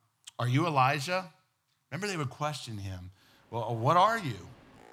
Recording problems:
train or aircraft noise; faint; from 3.5 s on; 25 dB below the speech

